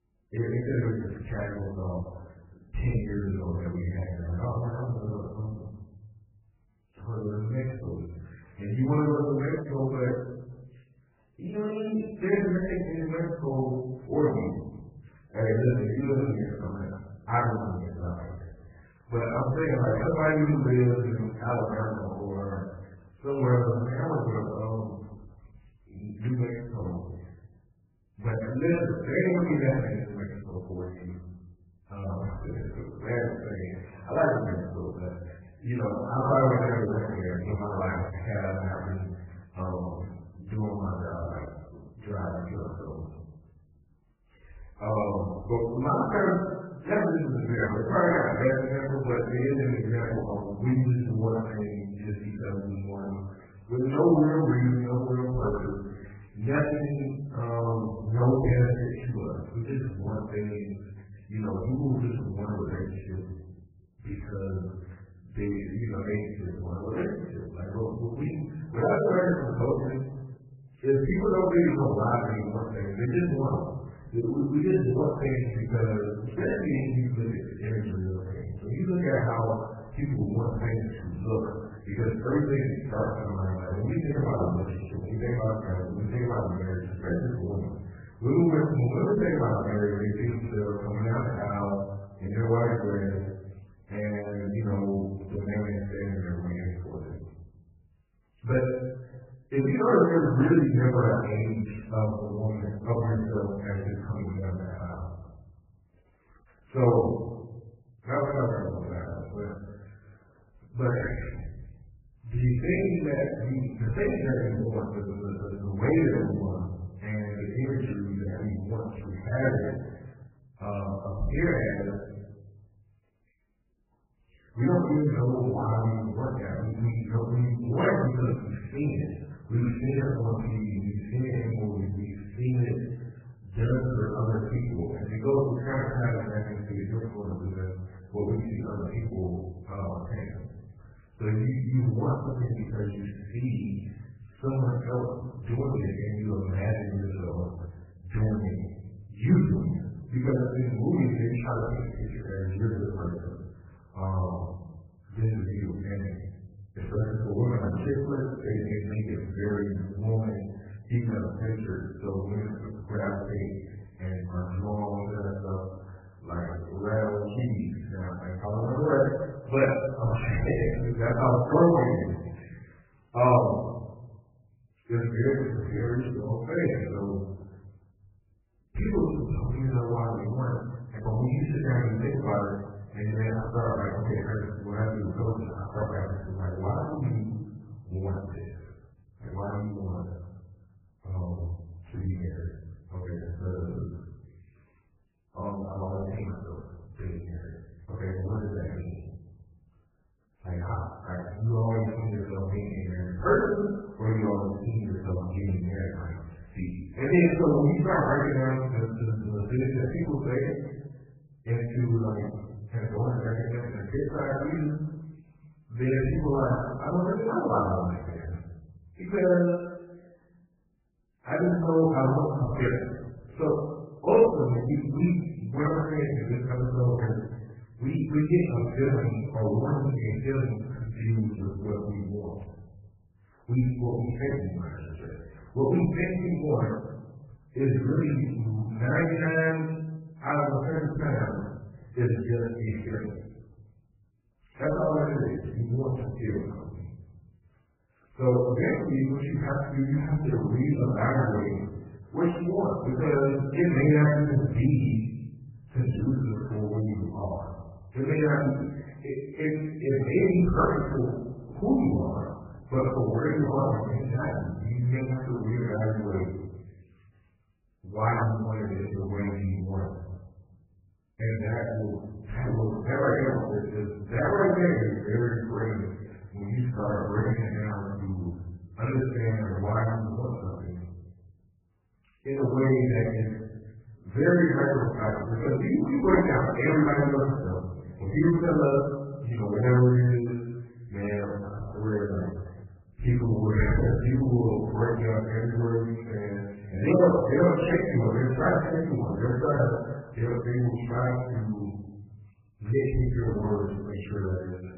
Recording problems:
off-mic speech; far
garbled, watery; badly; nothing above 2.5 kHz
room echo; noticeable; dies away in 1 s

